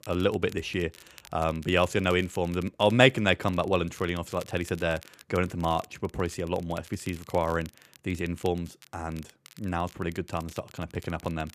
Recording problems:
crackle, like an old record; faint; 25 dB below the speech

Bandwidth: 14.5 kHz